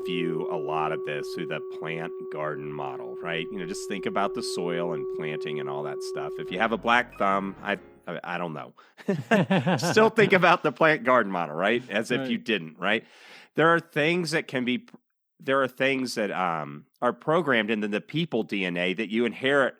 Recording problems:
background music; loud; until 7.5 s; 9 dB below the speech

